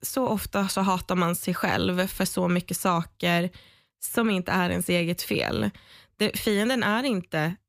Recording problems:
none

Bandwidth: 15 kHz